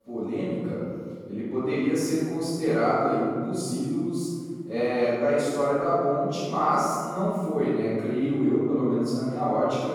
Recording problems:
room echo; strong; dies away in 2 s
off-mic speech; far

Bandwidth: 18 kHz